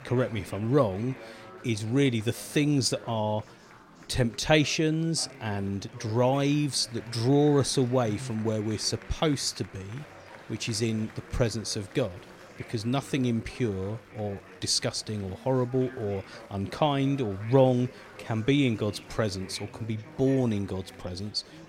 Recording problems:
chatter from many people; noticeable; throughout; 20 dB below the speech

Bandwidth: 16 kHz